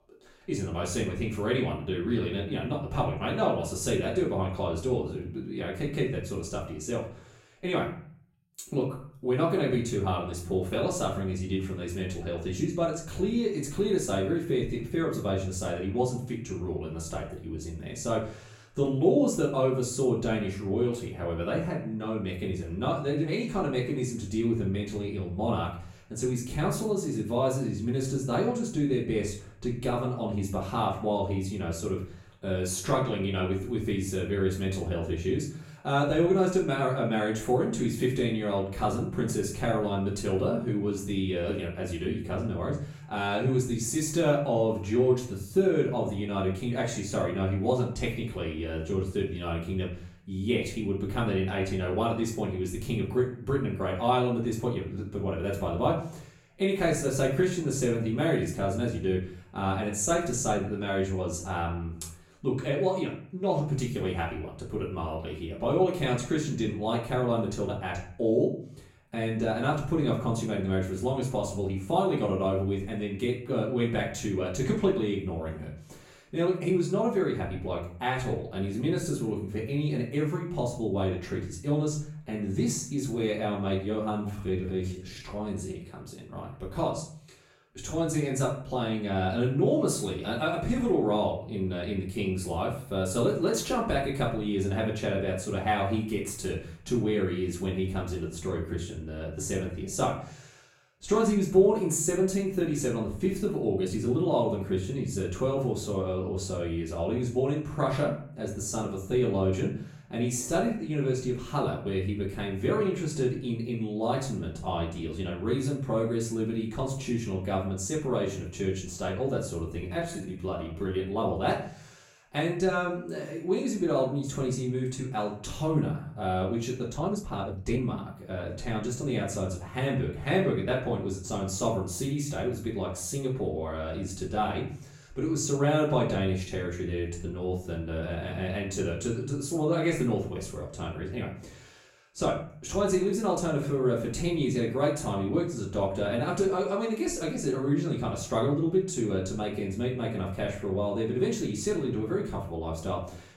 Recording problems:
off-mic speech; far
room echo; noticeable; dies away in 0.5 s
uneven, jittery; strongly; from 1:24 to 2:08

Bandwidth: 16 kHz